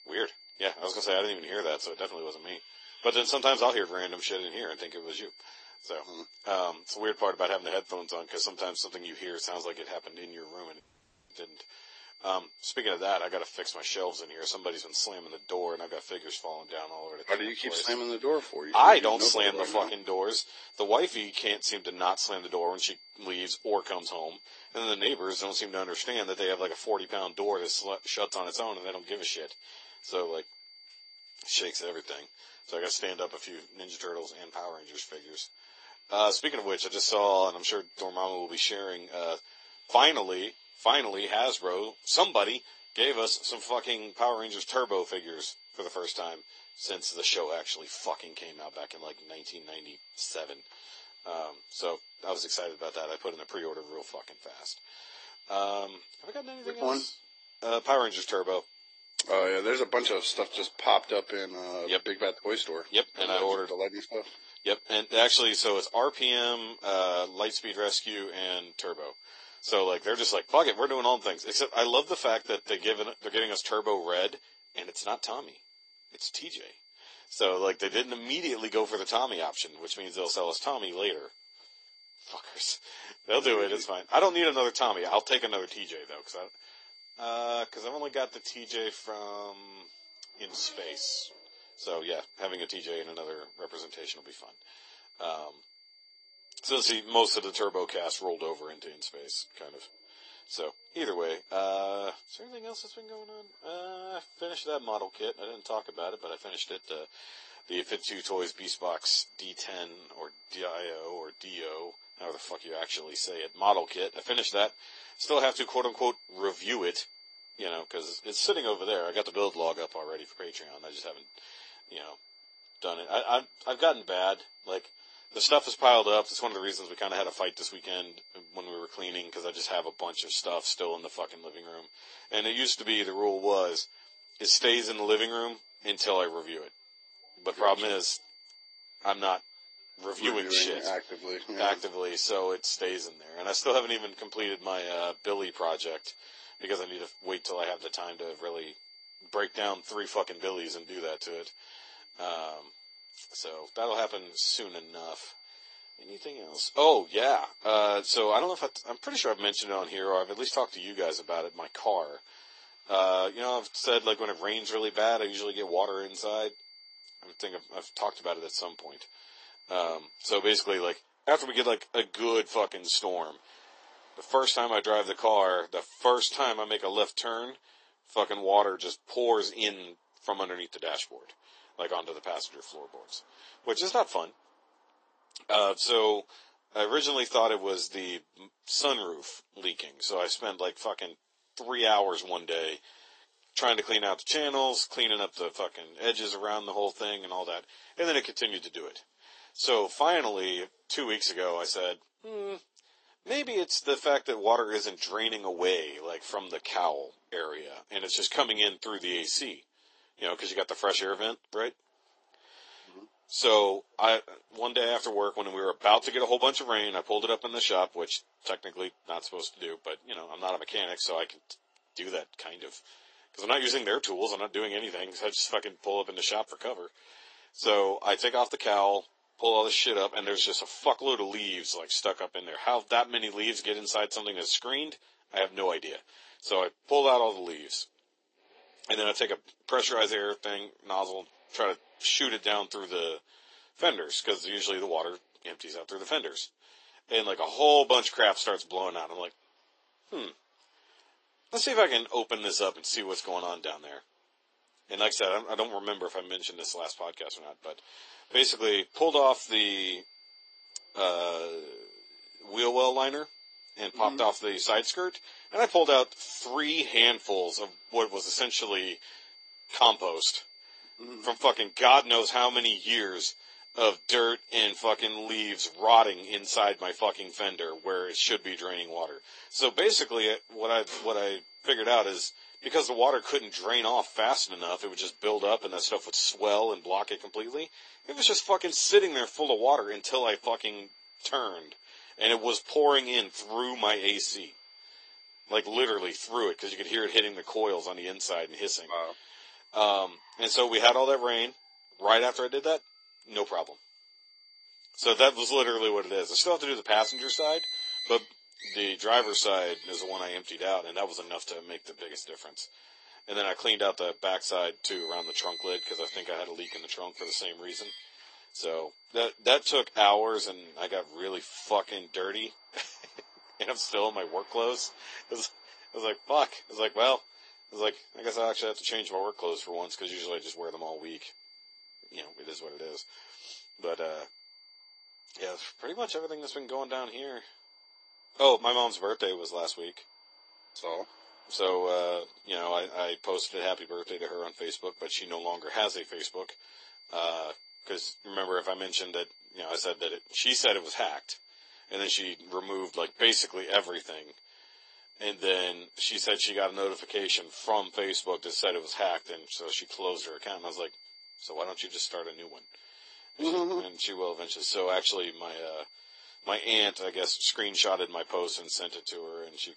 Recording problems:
thin; very; fading below 350 Hz
garbled, watery; slightly; nothing above 8 kHz
traffic noise; noticeable; throughout; 15 dB below the speech
high-pitched whine; faint; until 2:51 and from 4:19 on; 4.5 kHz, 25 dB below the speech
audio cutting out; at 11 s for 0.5 s

